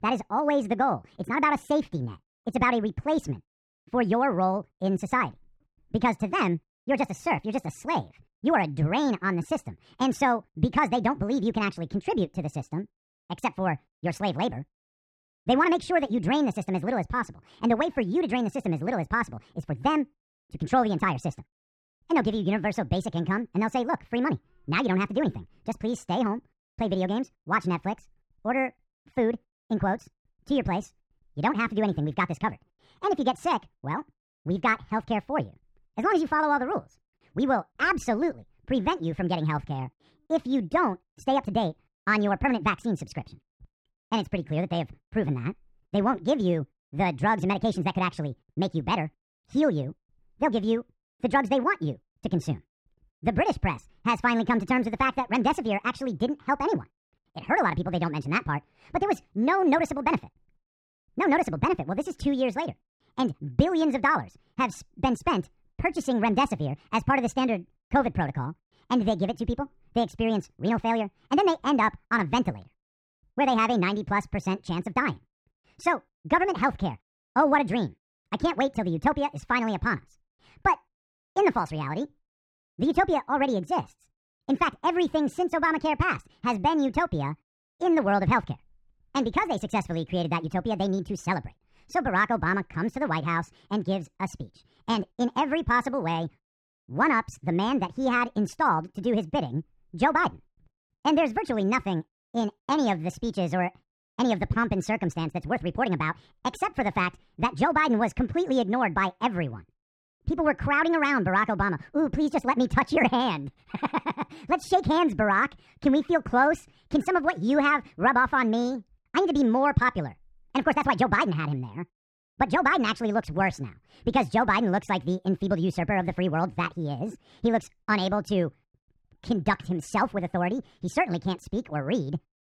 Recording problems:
wrong speed and pitch; too fast and too high; 1.5 times normal speed
muffled; slightly; fading above 3 kHz

